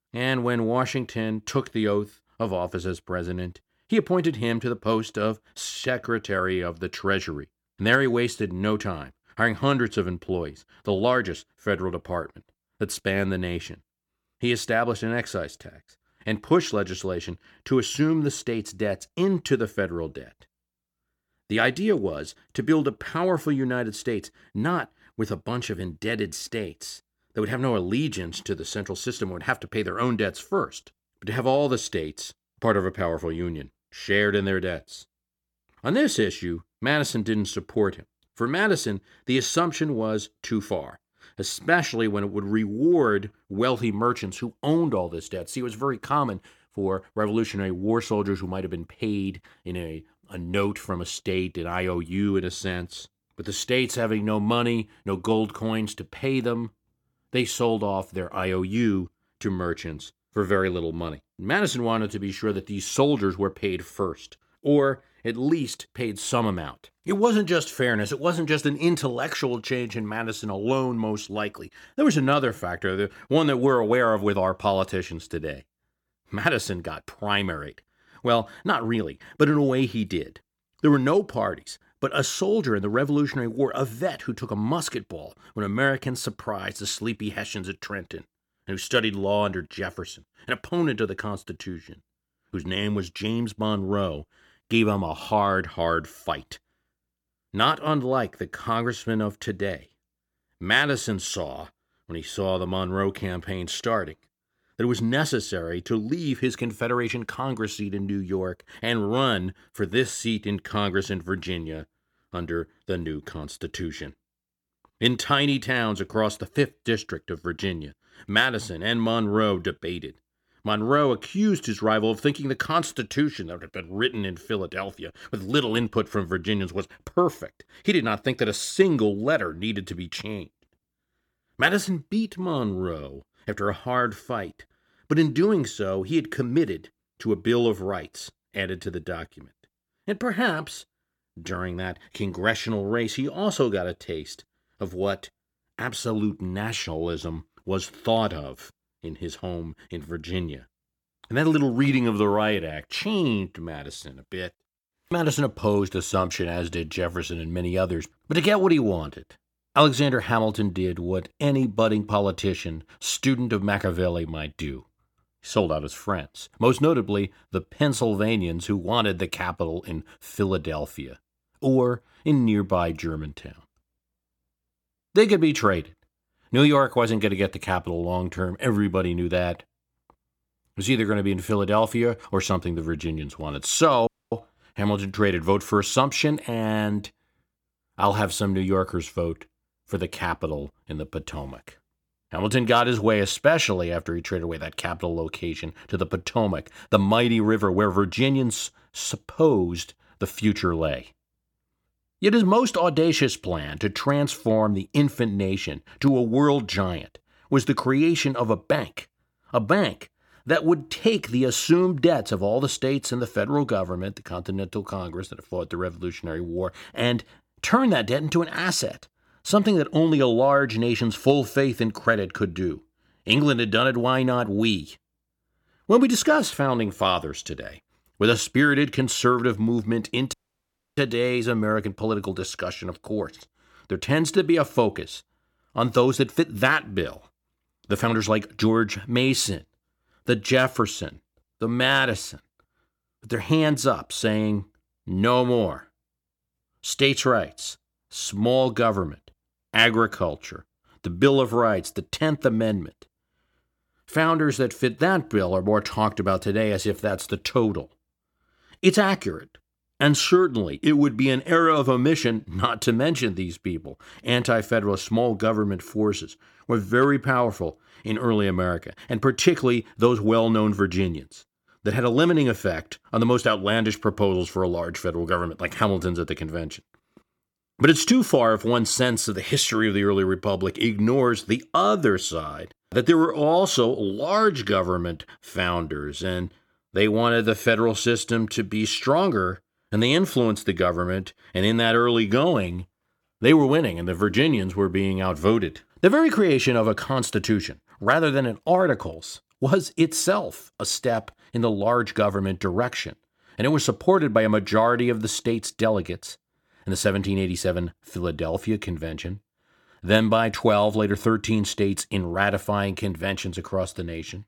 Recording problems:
audio cutting out; at 3:04 and at 3:50 for 0.5 s

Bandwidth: 18 kHz